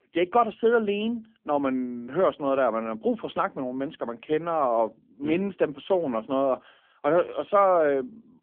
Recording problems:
phone-call audio; poor line; nothing above 3.5 kHz

